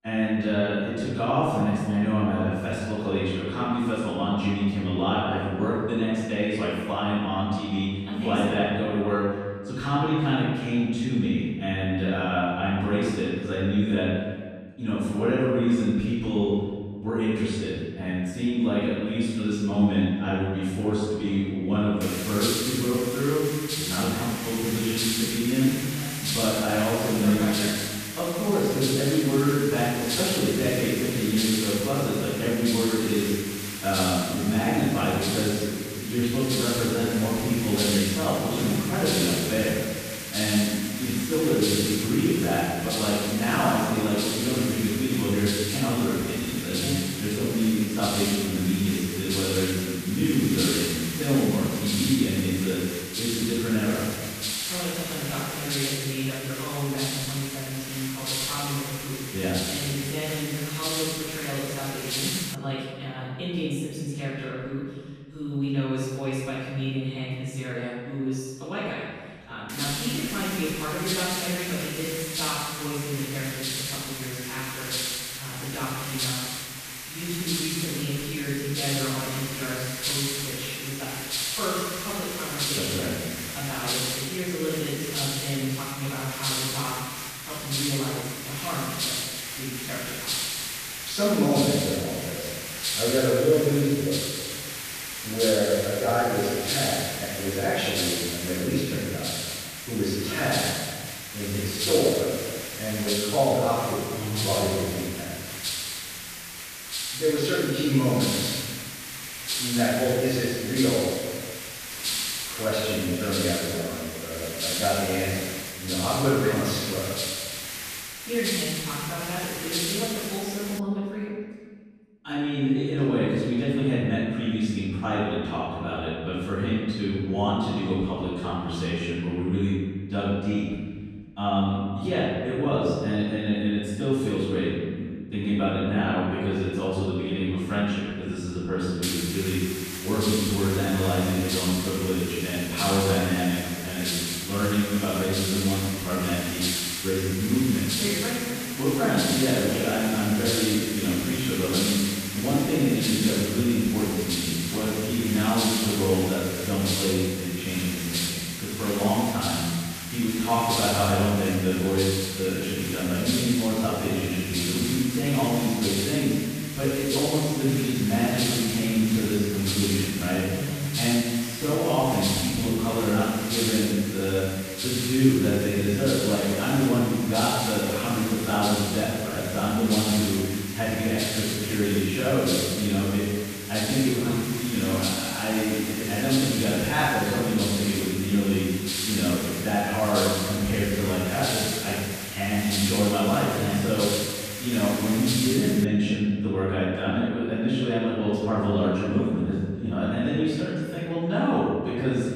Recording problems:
room echo; strong; dies away in 1.6 s
off-mic speech; far
hiss; loud; from 22 s to 1:03, from 1:10 to 2:01 and from 2:19 to 3:16; 4 dB below the speech

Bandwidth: 14.5 kHz